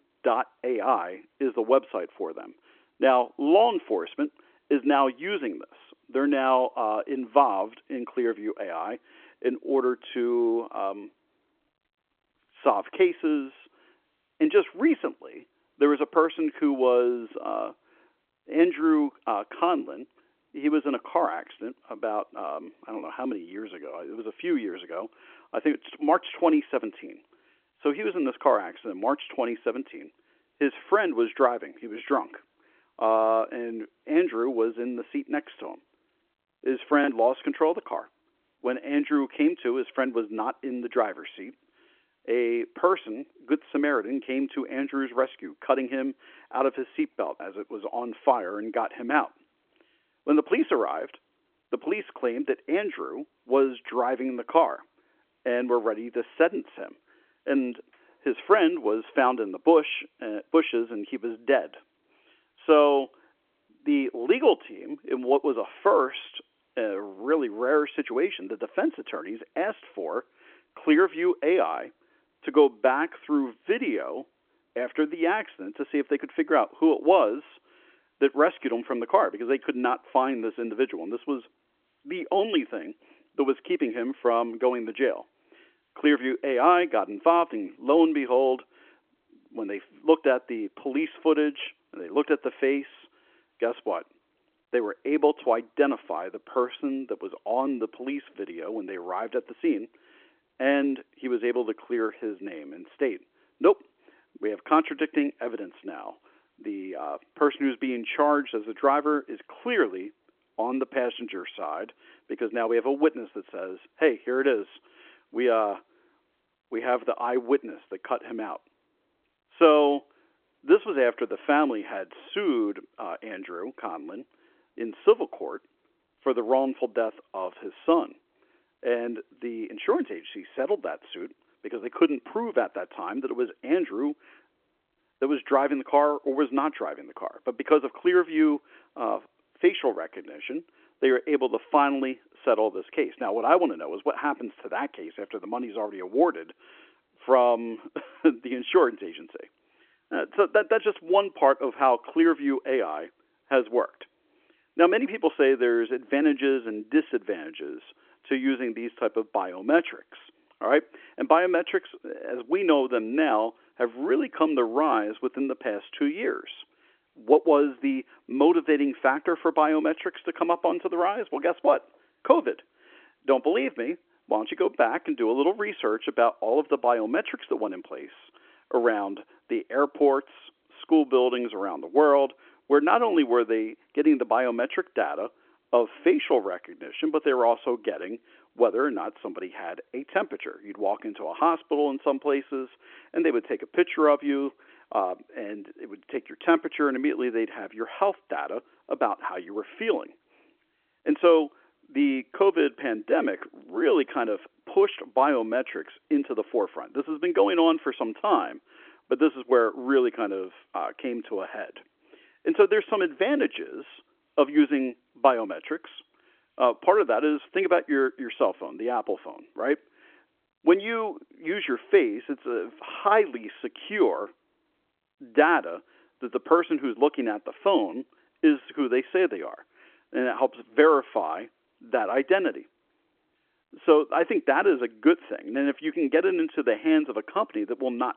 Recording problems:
phone-call audio
choppy; occasionally; at 37 s; 1% of the speech affected

